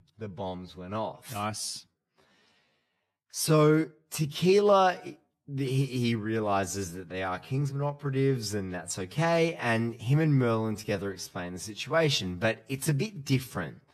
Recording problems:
wrong speed, natural pitch; too slow; 0.7 times normal speed

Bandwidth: 13.5 kHz